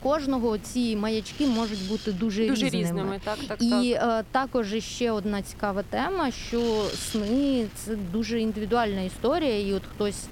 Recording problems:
wind noise on the microphone; occasional gusts; 15 dB below the speech

